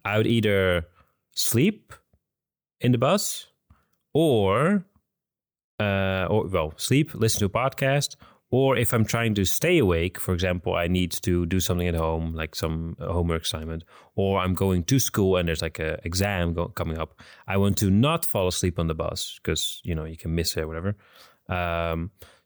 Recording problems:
none

